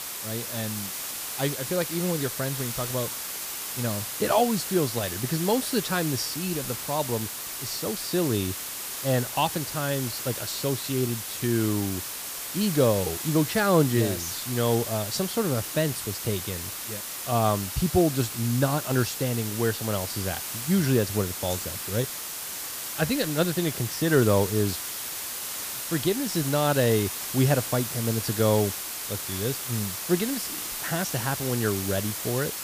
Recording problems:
hiss; loud; throughout; 4 dB below the speech

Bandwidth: 15 kHz